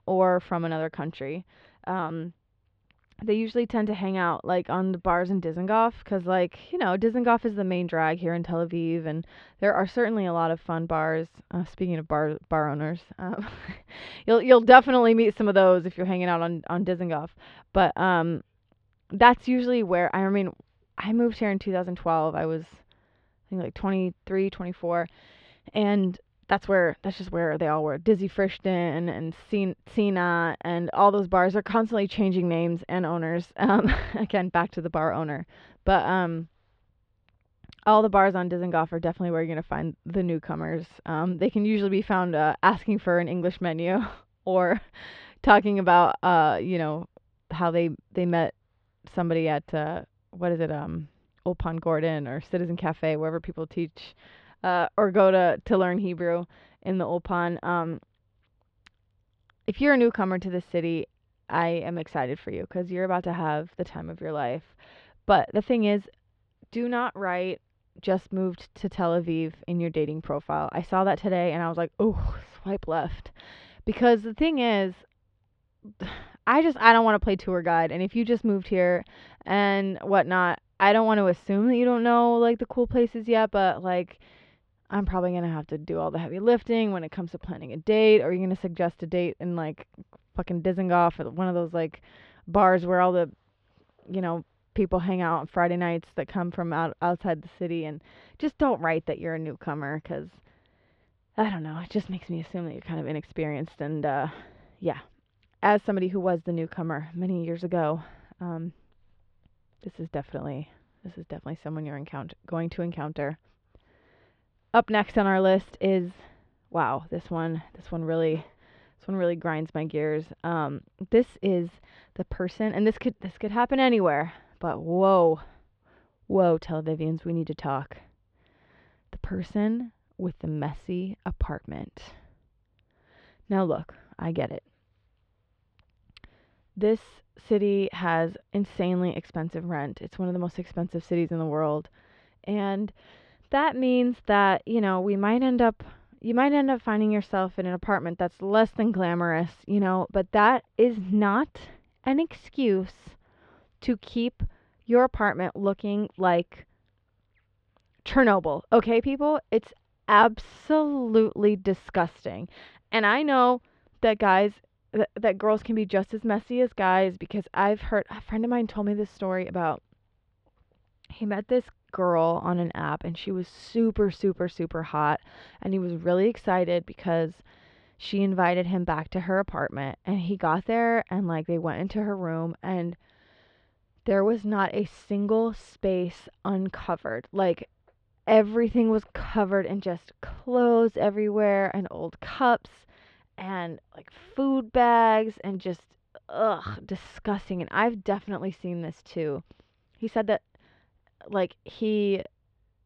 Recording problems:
muffled; slightly; fading above 3.5 kHz

